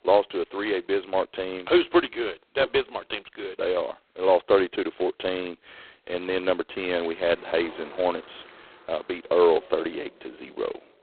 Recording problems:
phone-call audio; poor line; nothing above 4 kHz
traffic noise; faint; from 7 s on; 20 dB below the speech

